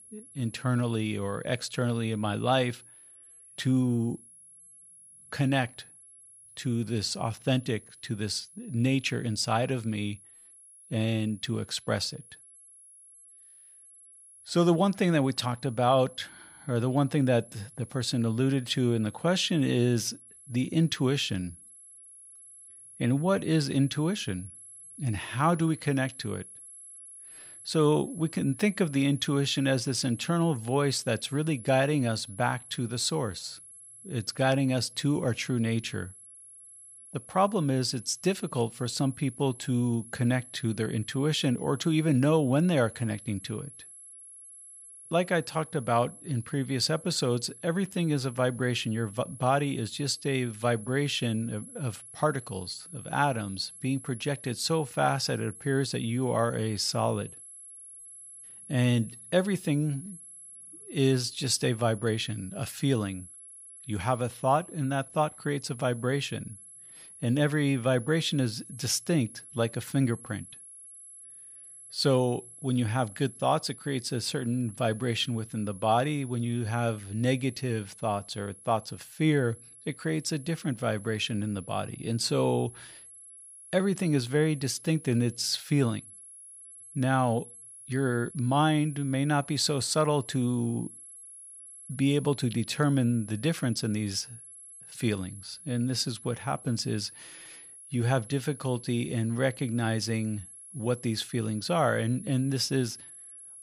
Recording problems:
high-pitched whine; noticeable; throughout; 11 kHz, 15 dB below the speech

